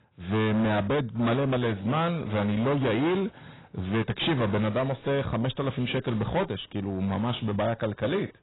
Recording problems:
distortion; heavy; 21% of the sound clipped
garbled, watery; badly; nothing above 4 kHz

